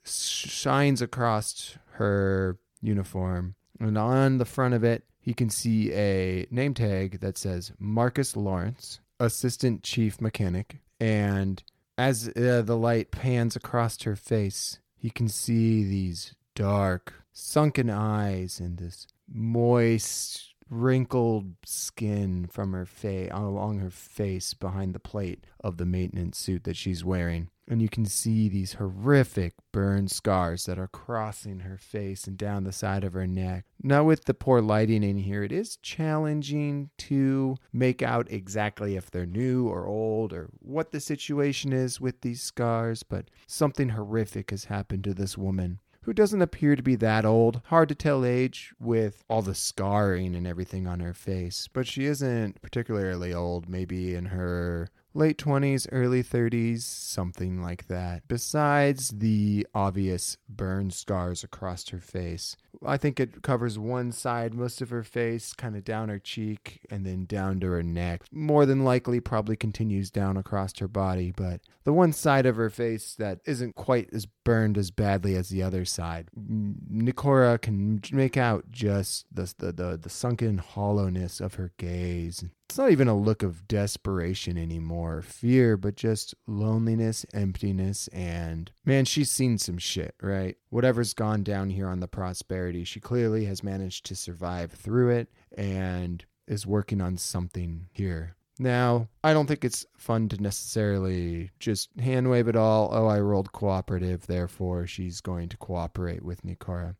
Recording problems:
none

